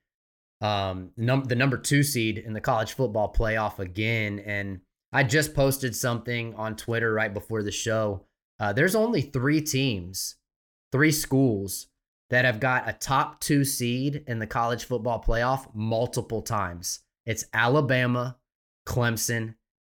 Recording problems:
none

